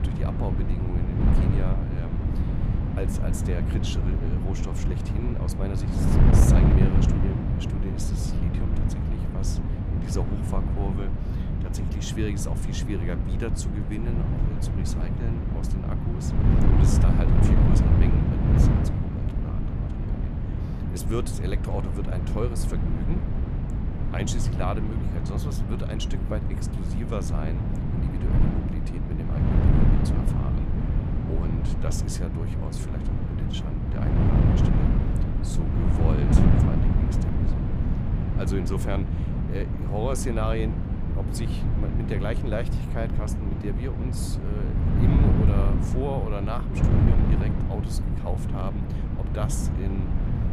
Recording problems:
wind noise on the microphone; heavy; 2 dB above the speech

